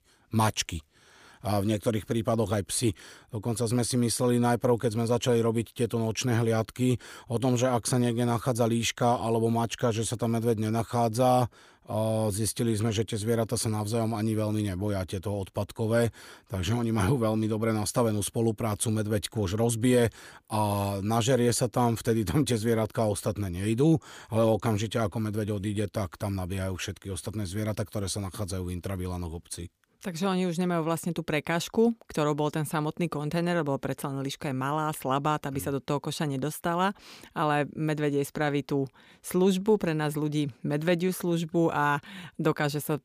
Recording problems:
none

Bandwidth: 15 kHz